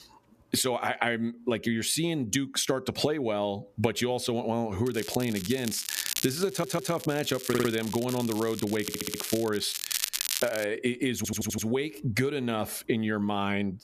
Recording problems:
squashed, flat; somewhat
crackling; loud; from 5 to 11 s; 5 dB below the speech
audio stuttering; 4 times, first at 6.5 s

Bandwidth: 14.5 kHz